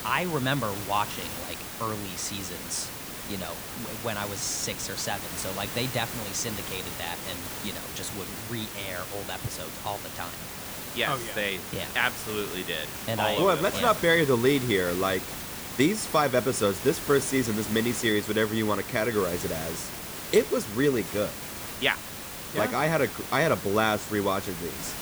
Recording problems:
hiss; loud; throughout; 7 dB below the speech

